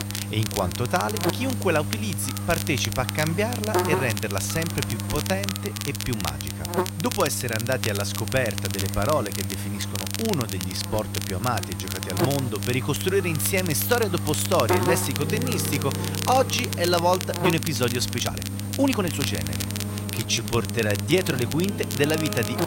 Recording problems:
electrical hum; loud; throughout; 50 Hz, 8 dB below the speech
crackle, like an old record; loud; 7 dB below the speech
background music; noticeable; from 15 s on; 10 dB below the speech
uneven, jittery; strongly; from 5 to 21 s

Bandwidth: 16 kHz